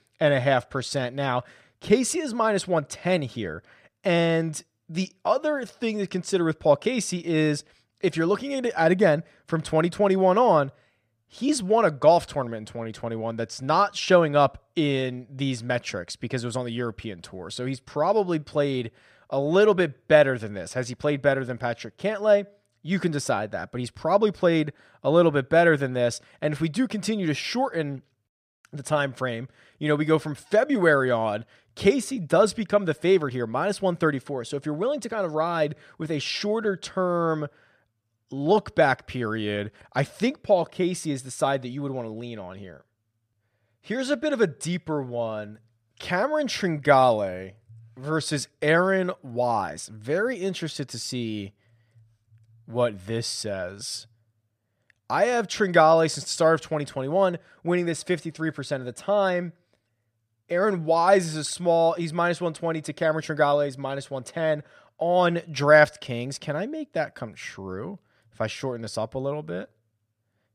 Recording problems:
none

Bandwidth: 15 kHz